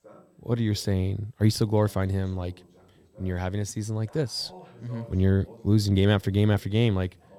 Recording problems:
voice in the background; faint; throughout; 25 dB below the speech

